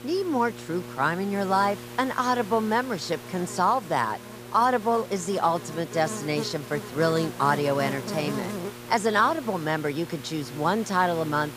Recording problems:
electrical hum; noticeable; throughout; 60 Hz, 15 dB below the speech
hiss; noticeable; throughout; 20 dB below the speech

